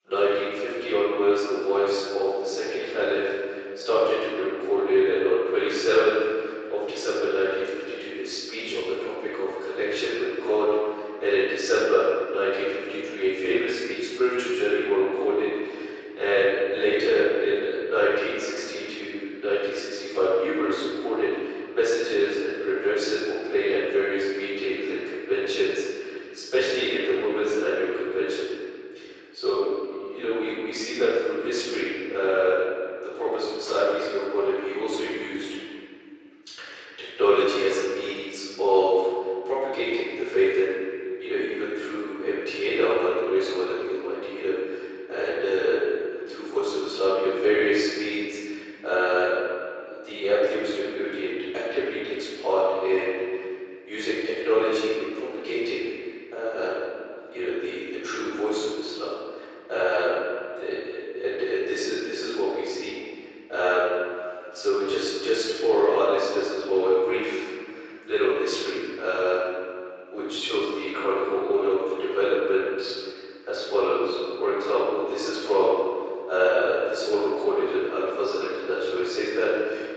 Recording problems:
room echo; strong; dies away in 2.3 s
off-mic speech; far
thin; very; fading below 350 Hz
garbled, watery; slightly; nothing above 7.5 kHz

